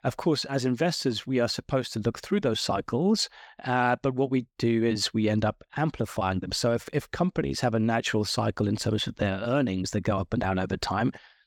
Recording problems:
none

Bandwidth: 18 kHz